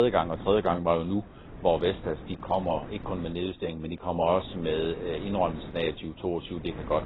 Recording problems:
garbled, watery; badly; nothing above 4 kHz
wind noise on the microphone; occasional gusts; 20 dB below the speech
abrupt cut into speech; at the start

